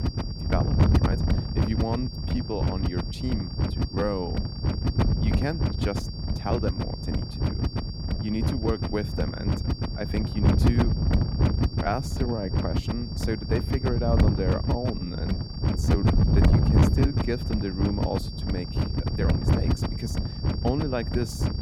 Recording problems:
wind noise on the microphone; heavy; 1 dB below the speech
high-pitched whine; loud; throughout; 4.5 kHz, 9 dB below the speech
uneven, jittery; strongly; from 1 to 19 s

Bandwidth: 17 kHz